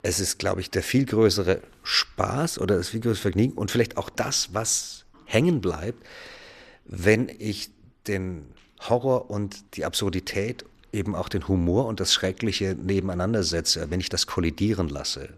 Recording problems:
none

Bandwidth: 14 kHz